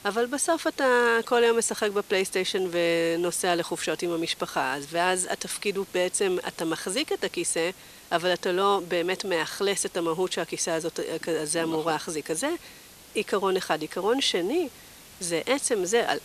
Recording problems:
thin; somewhat; fading below 500 Hz
hiss; faint; throughout; 20 dB below the speech

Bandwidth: 14 kHz